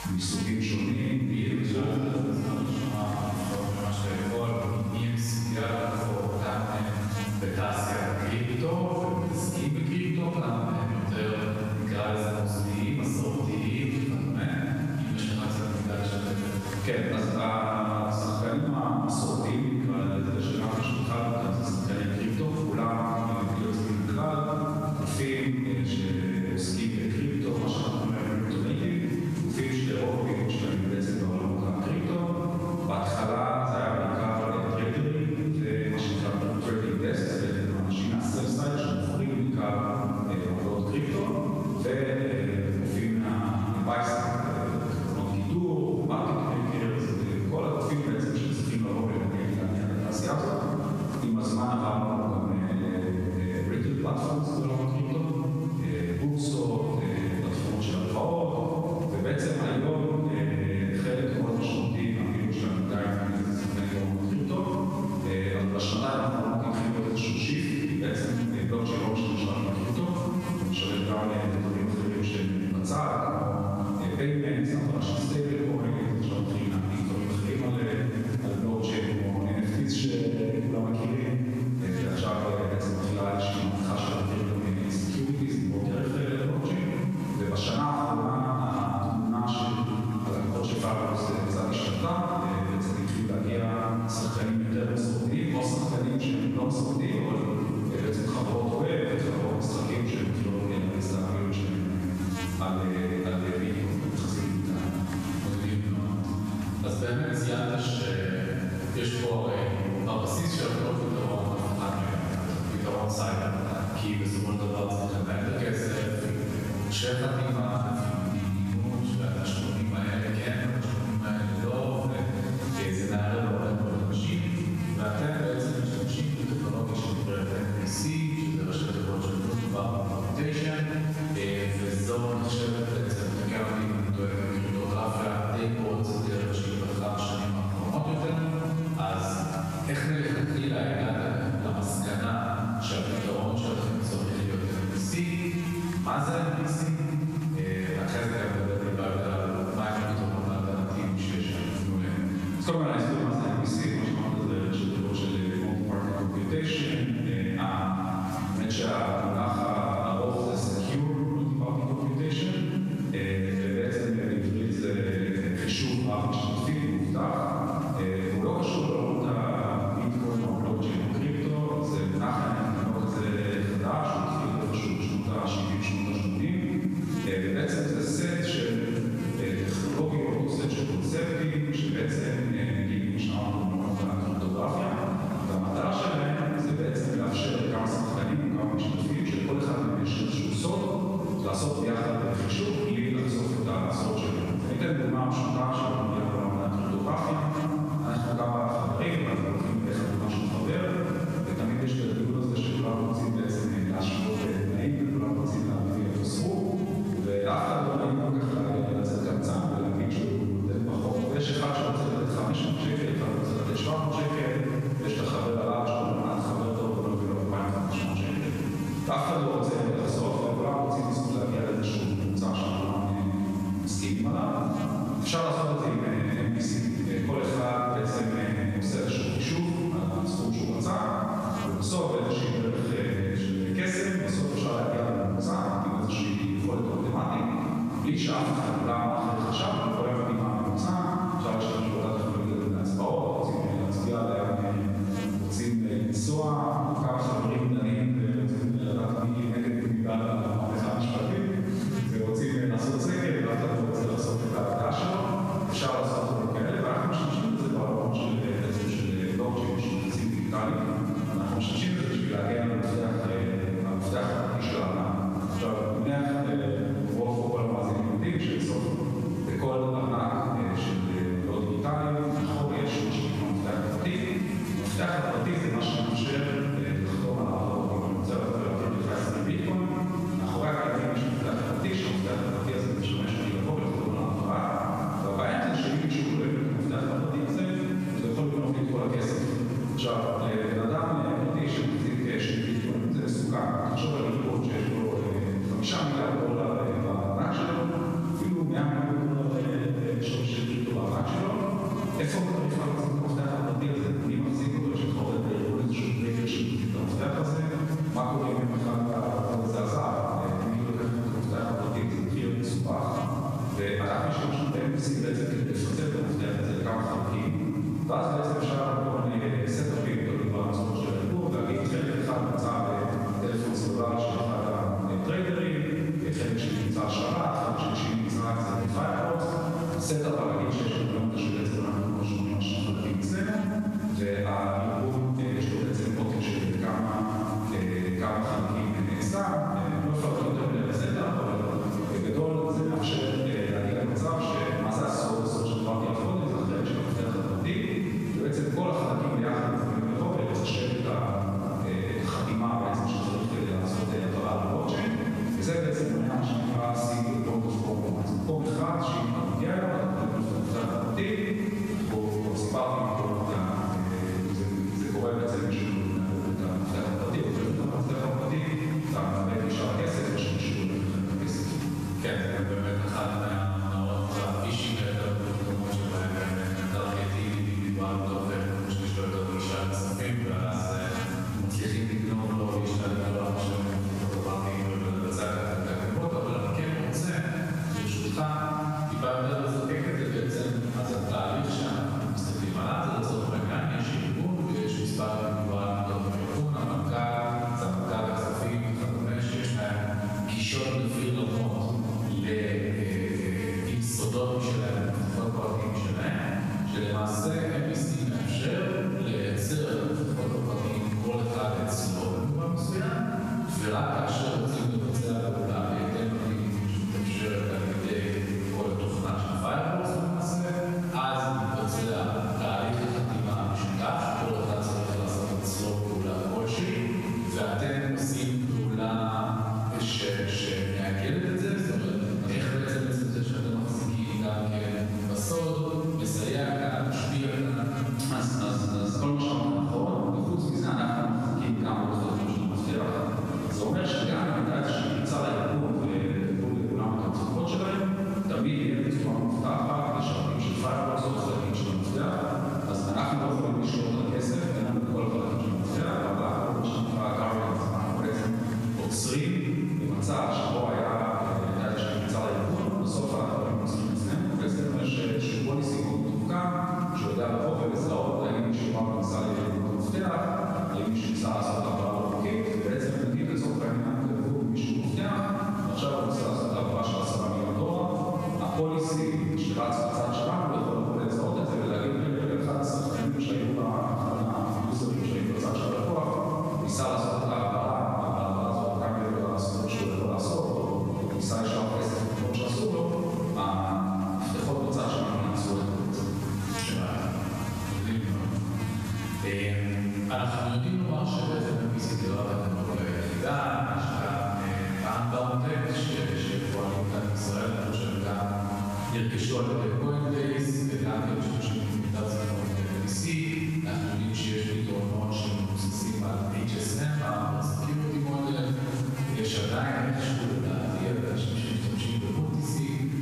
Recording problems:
room echo; strong; dies away in 2.7 s
off-mic speech; far
squashed, flat; somewhat
electrical hum; noticeable; throughout; 50 Hz, 15 dB below the speech

